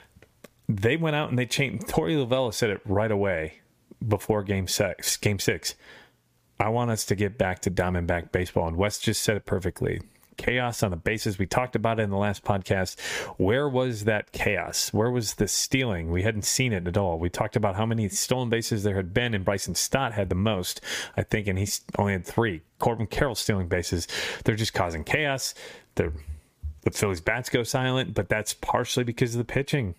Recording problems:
squashed, flat; somewhat

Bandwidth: 15 kHz